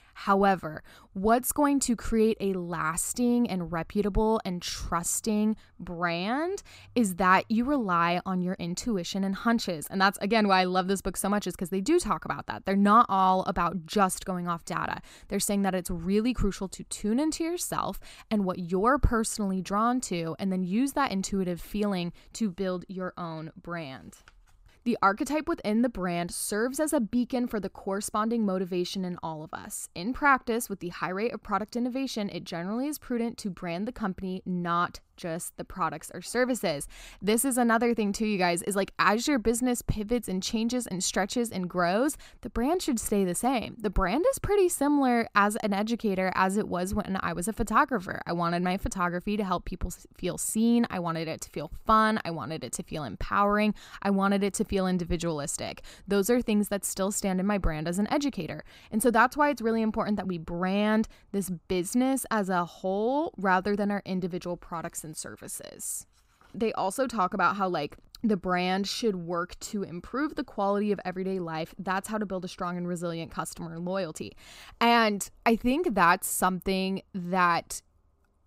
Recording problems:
none

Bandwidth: 15.5 kHz